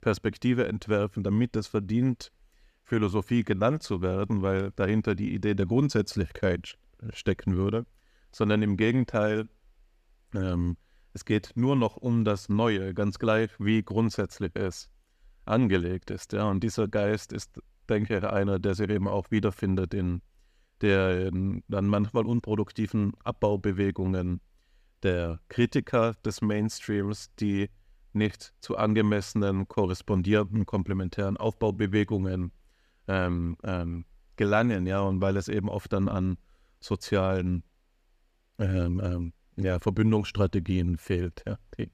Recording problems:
none

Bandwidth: 14.5 kHz